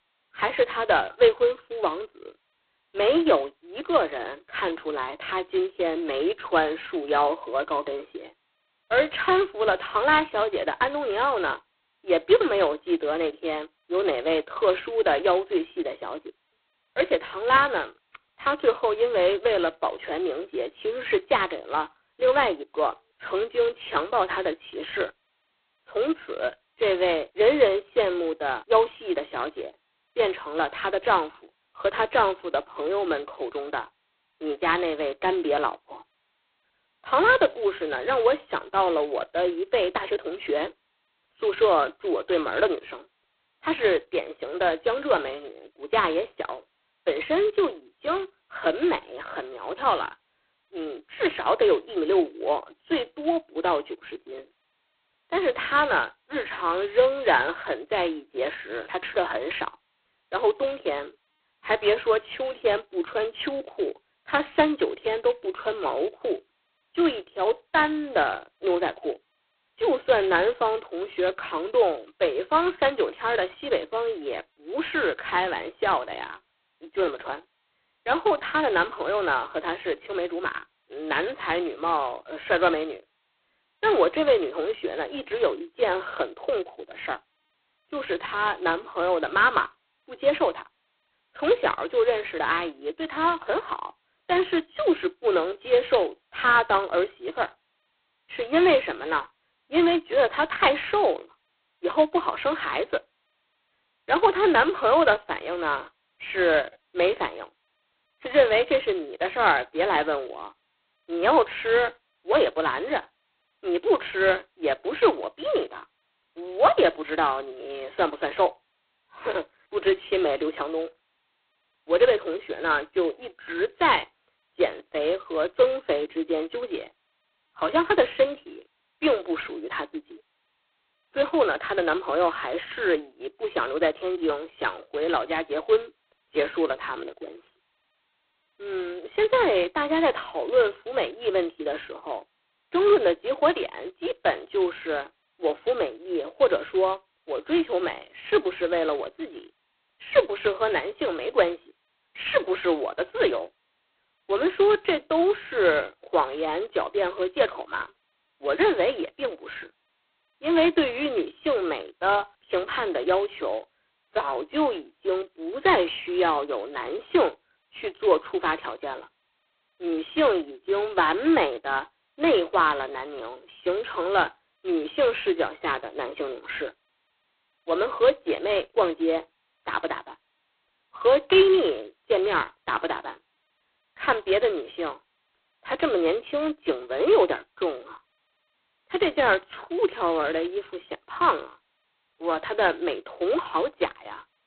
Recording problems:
phone-call audio; poor line; nothing above 4 kHz

